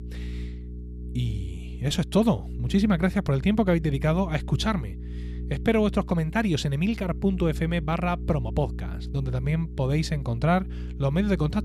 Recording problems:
electrical hum; noticeable; throughout; 60 Hz, 20 dB below the speech

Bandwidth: 15.5 kHz